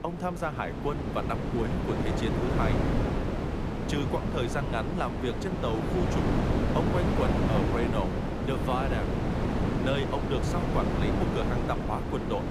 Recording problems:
wind noise on the microphone; heavy; as loud as the speech

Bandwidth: 15.5 kHz